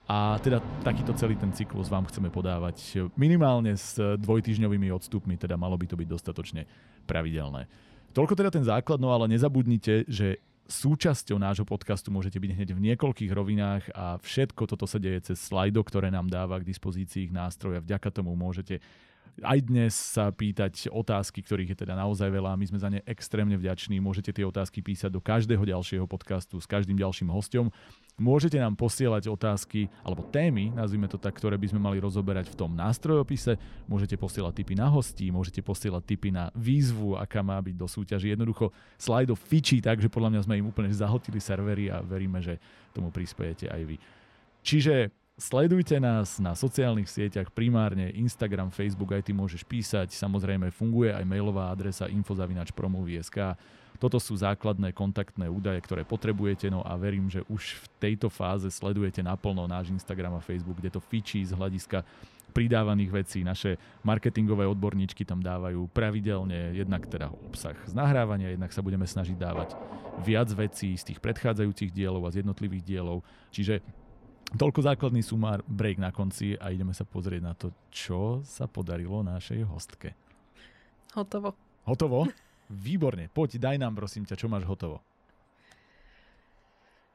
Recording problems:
rain or running water; noticeable; throughout; 20 dB below the speech

